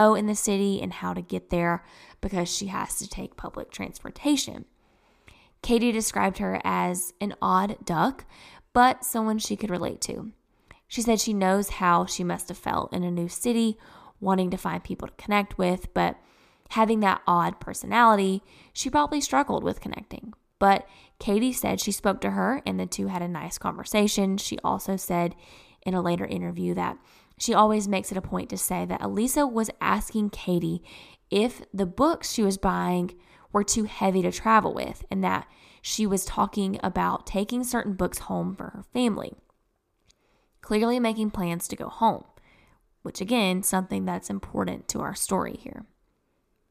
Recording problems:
abrupt cut into speech; at the start

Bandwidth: 14.5 kHz